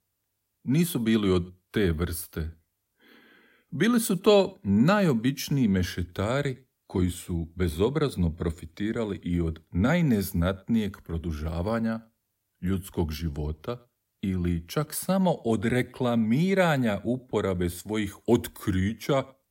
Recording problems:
none

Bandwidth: 16 kHz